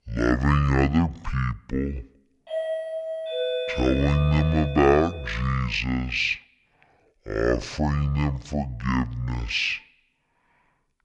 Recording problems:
wrong speed and pitch; too slow and too low; 0.5 times normal speed
doorbell; noticeable; from 2.5 to 5.5 s; peak 3 dB below the speech

